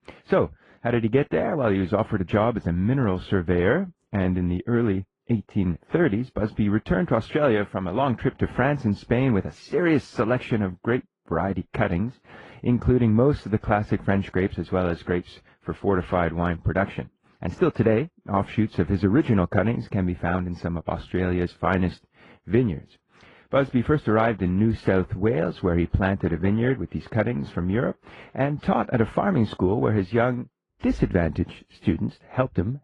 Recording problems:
muffled; very; fading above 3.5 kHz
garbled, watery; slightly

